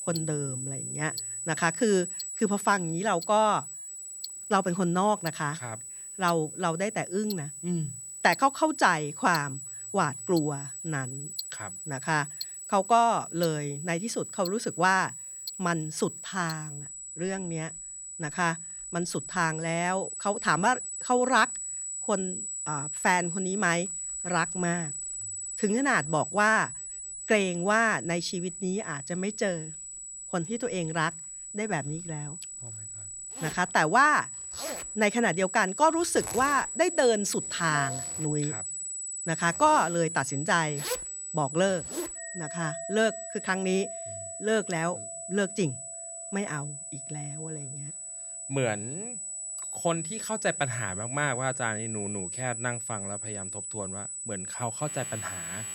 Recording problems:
high-pitched whine; loud; throughout; 8 kHz, 7 dB below the speech
household noises; noticeable; throughout; 15 dB below the speech

